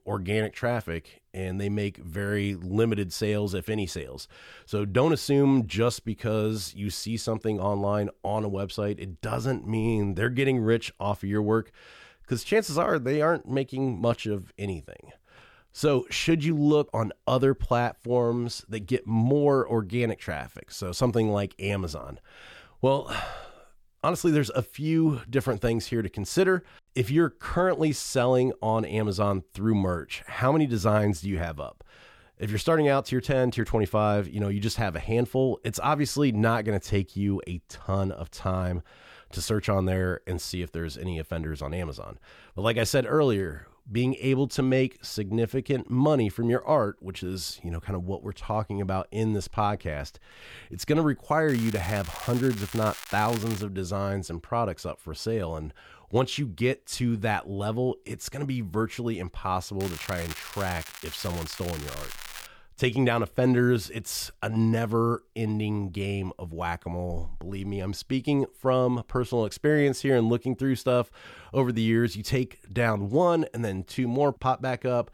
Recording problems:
crackling; noticeable; from 51 to 54 s and from 1:00 to 1:02; 10 dB below the speech

